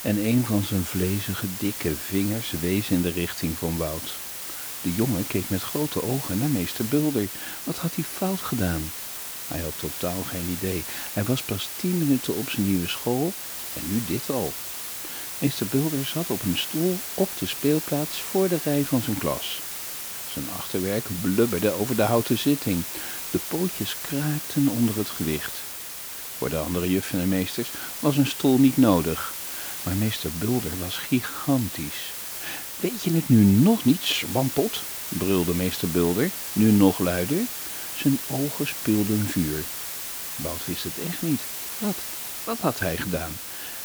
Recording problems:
hiss; loud; throughout; 4 dB below the speech

